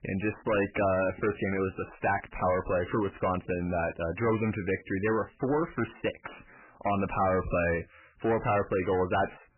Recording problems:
distortion; heavy; 7 dB below the speech
garbled, watery; badly; nothing above 3 kHz

